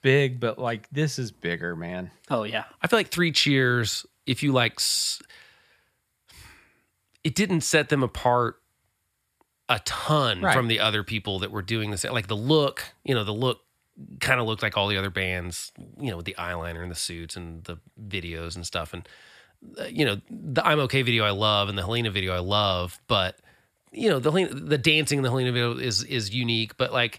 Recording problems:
none

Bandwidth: 14.5 kHz